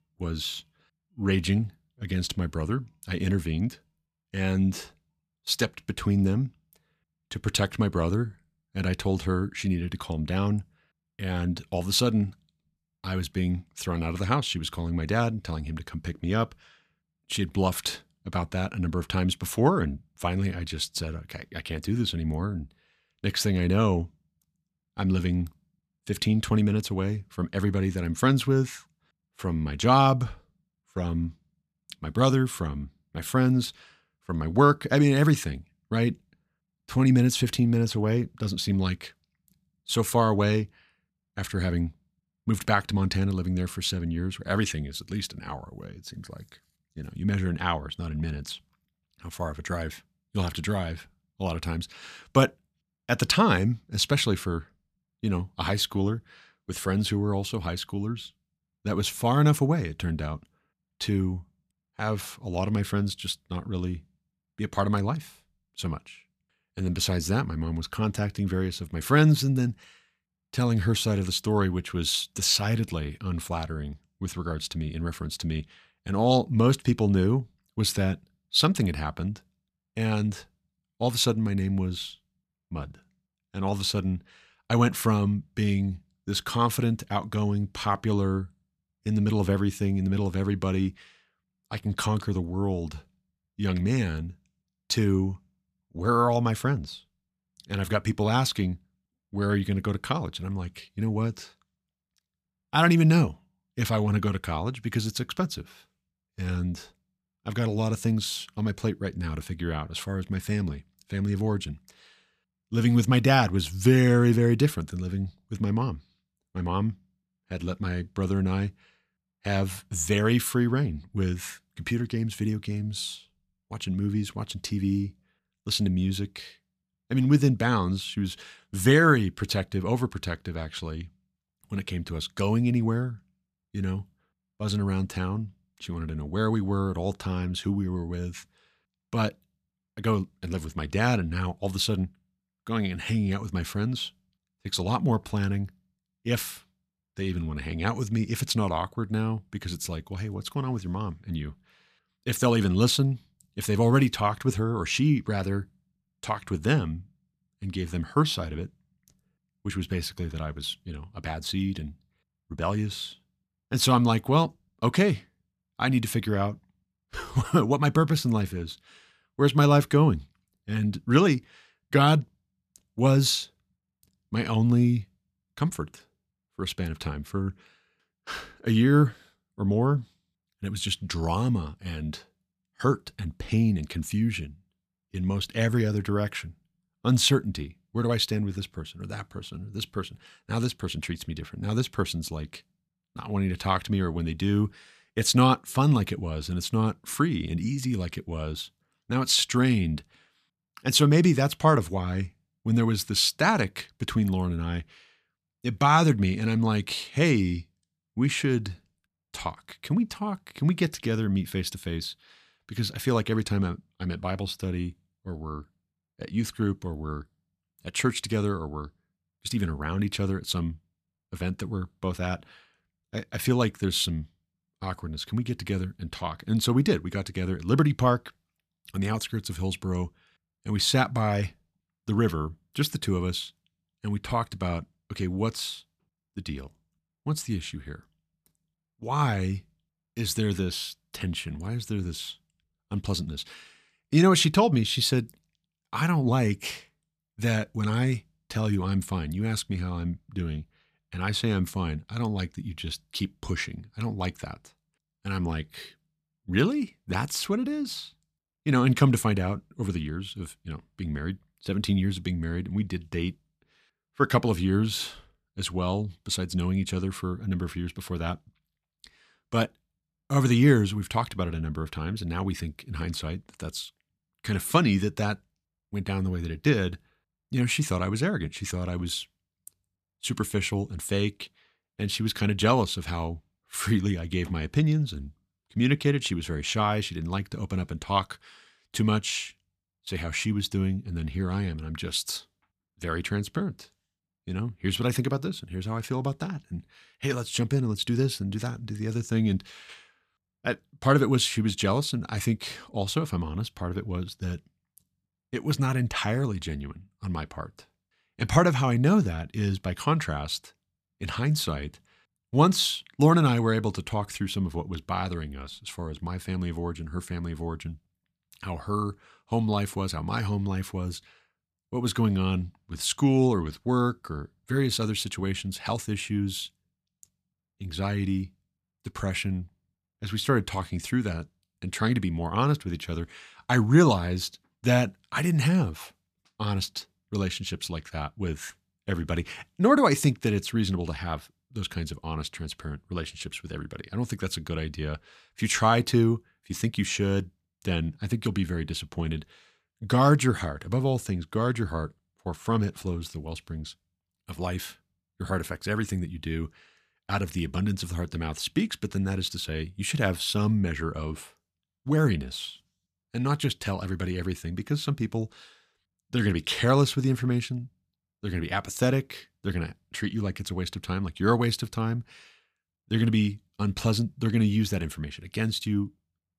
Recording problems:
none

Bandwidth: 14.5 kHz